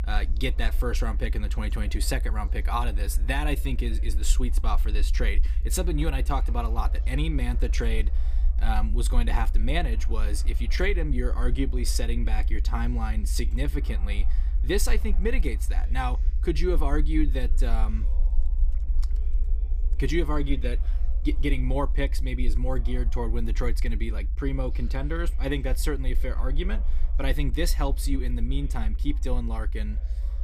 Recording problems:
low rumble; noticeable; throughout; 20 dB below the speech
background chatter; faint; throughout; 2 voices, 25 dB below the speech

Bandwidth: 15 kHz